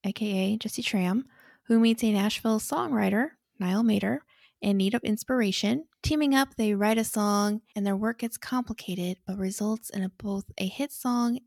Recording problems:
none

